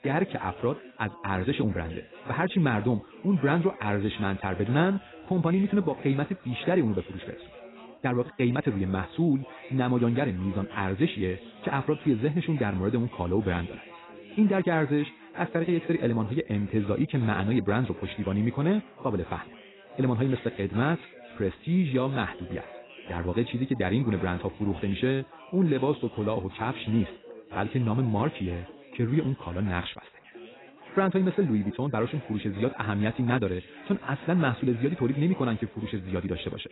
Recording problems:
garbled, watery; badly; nothing above 4 kHz
wrong speed, natural pitch; too fast; 1.5 times normal speed
background chatter; noticeable; throughout; 4 voices, 20 dB below the speech

